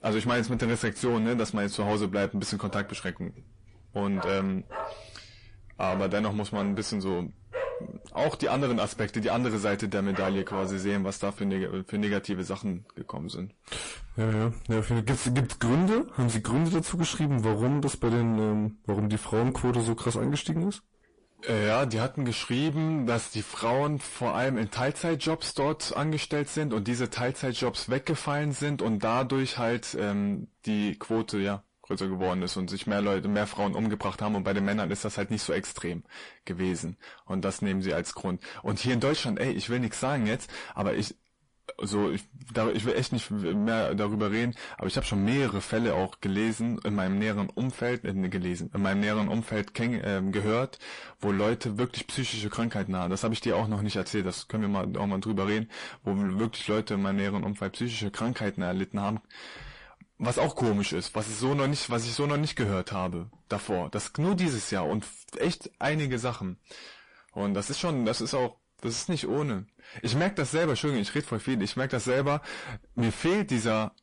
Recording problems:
distortion; heavy; 6 dB below the speech
garbled, watery; slightly; nothing above 10.5 kHz
dog barking; noticeable; from 2.5 to 11 s; peak 5 dB below the speech

